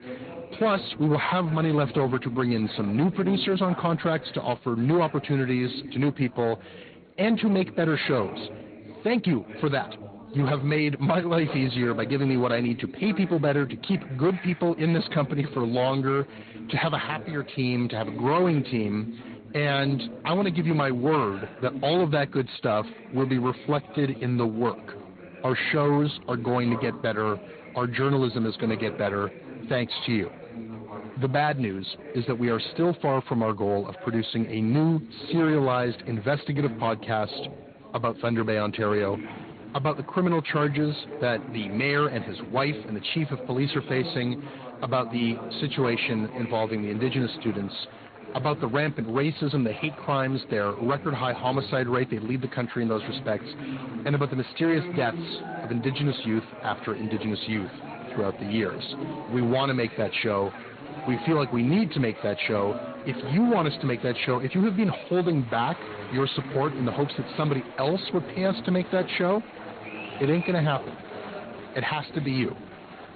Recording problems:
high frequencies cut off; severe; nothing above 4.5 kHz
distortion; slight; 11% of the sound clipped
garbled, watery; slightly
chatter from many people; noticeable; throughout; 15 dB below the speech
uneven, jittery; strongly; from 9 to 25 s

